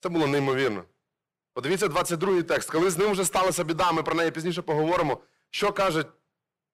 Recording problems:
distortion; heavy; 11% of the sound clipped

